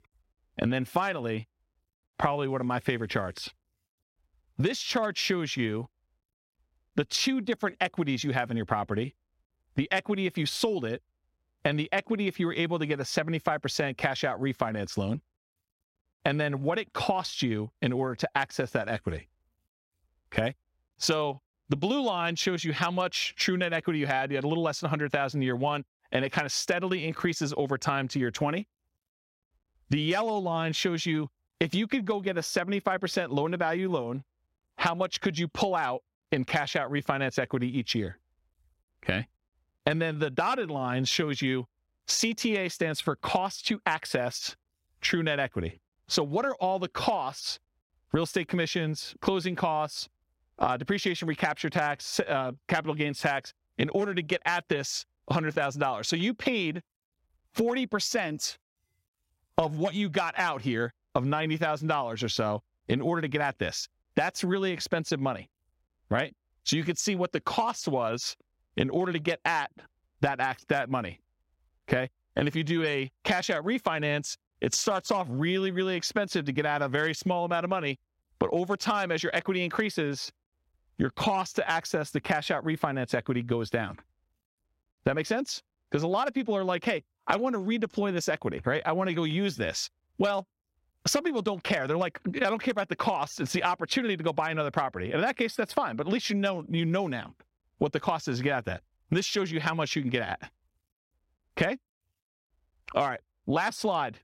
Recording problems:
squashed, flat; somewhat

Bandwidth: 16 kHz